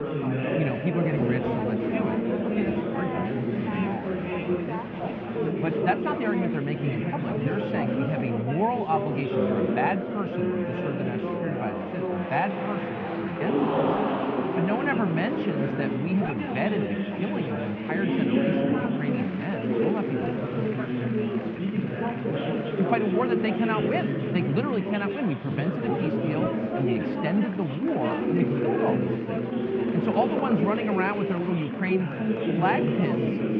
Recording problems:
muffled; very; fading above 2.5 kHz
chatter from many people; very loud; throughout; 2 dB above the speech

